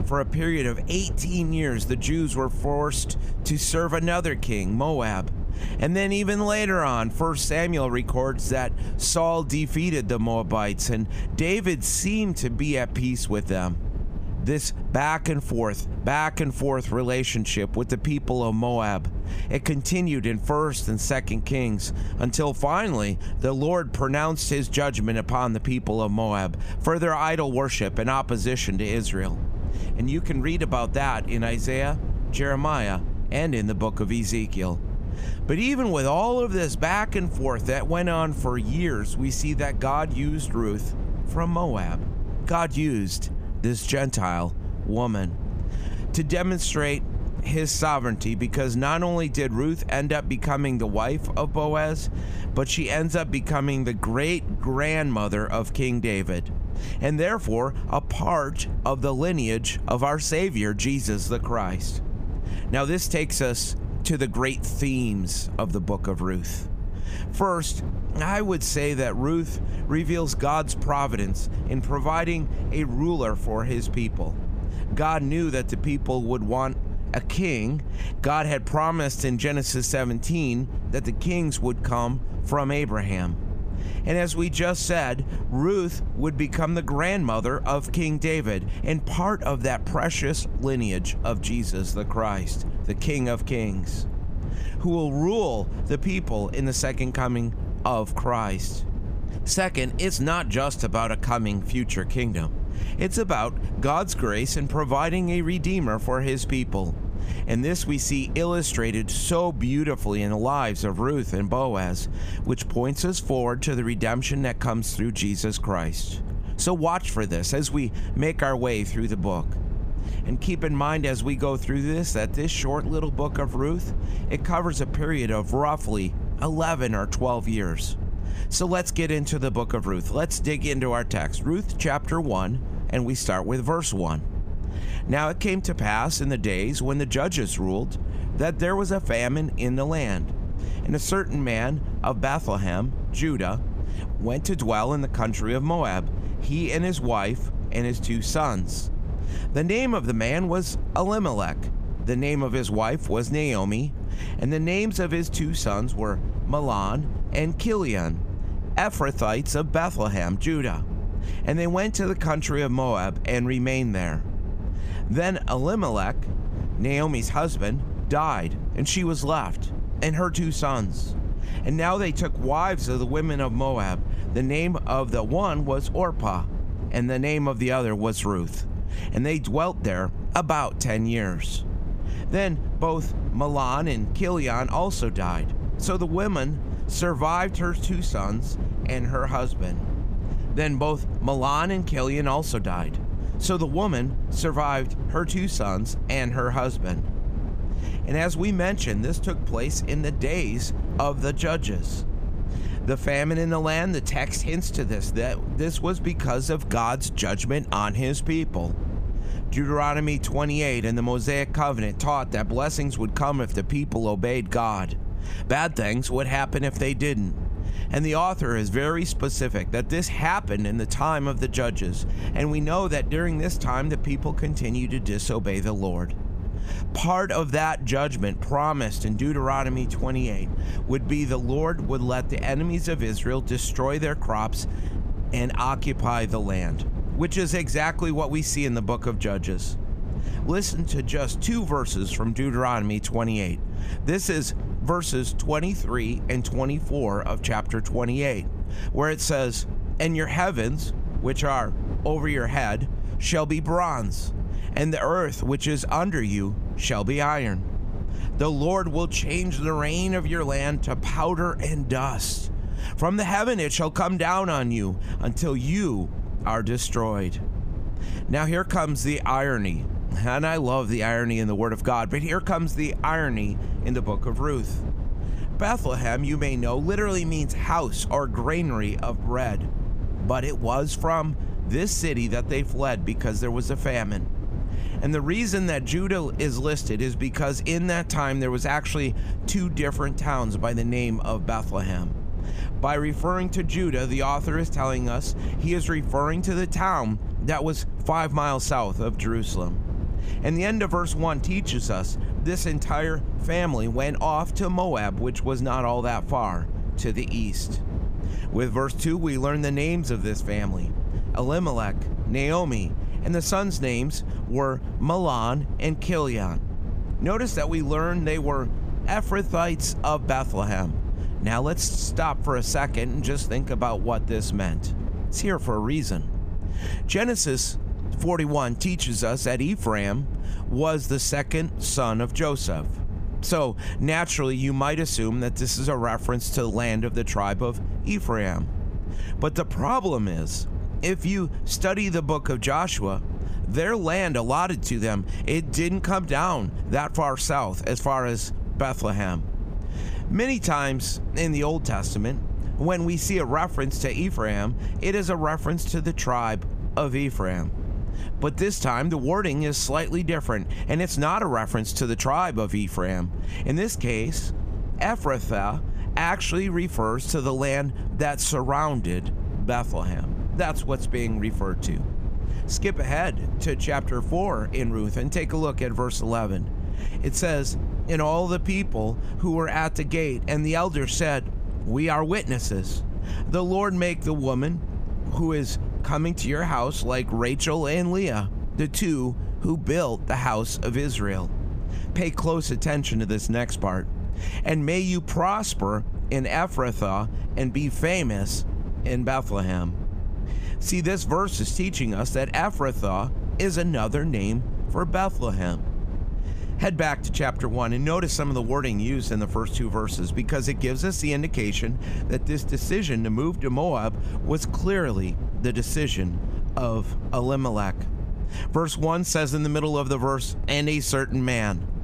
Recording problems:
squashed, flat; somewhat
low rumble; noticeable; throughout; 20 dB below the speech

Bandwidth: 15 kHz